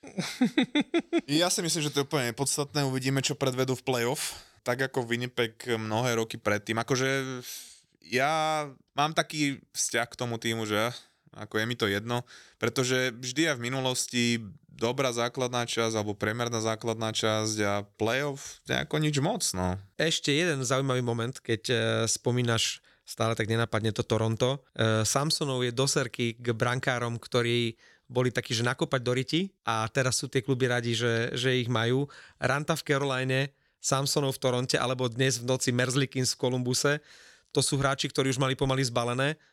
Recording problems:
none

